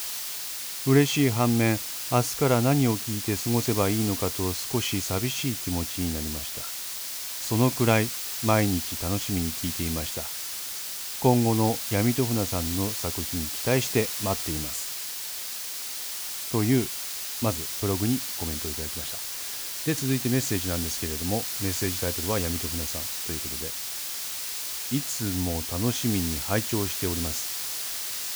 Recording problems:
hiss; loud; throughout; 3 dB below the speech

